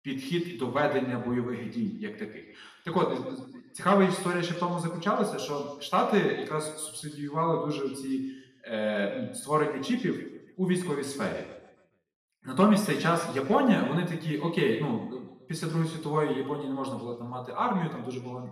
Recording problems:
off-mic speech; far
room echo; noticeable; dies away in 1 s

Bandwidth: 14.5 kHz